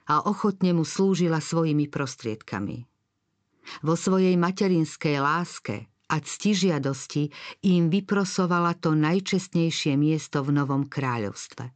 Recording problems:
high frequencies cut off; noticeable; nothing above 8 kHz

